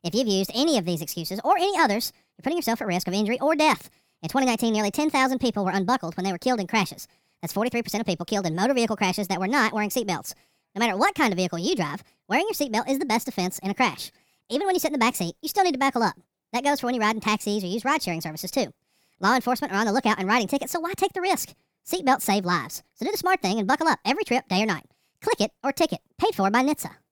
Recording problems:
wrong speed and pitch; too fast and too high; 1.5 times normal speed

